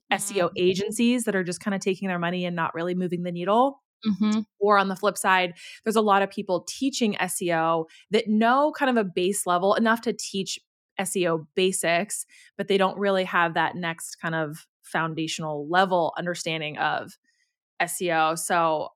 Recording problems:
none

